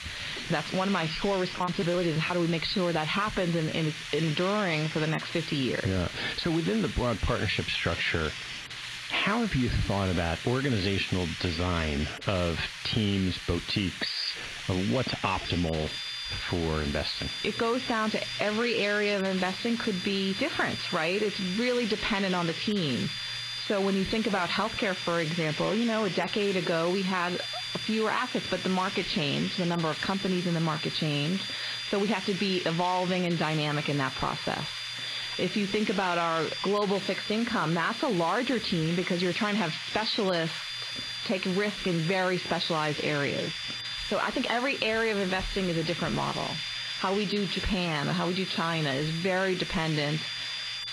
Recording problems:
garbled, watery; badly; nothing above 4 kHz
squashed, flat; heavily
hiss; loud; throughout; 8 dB below the speech
high-pitched whine; noticeable; from 15 s on; 3.5 kHz, 10 dB below the speech
choppy; very; from 1.5 to 2.5 s; 10% of the speech affected

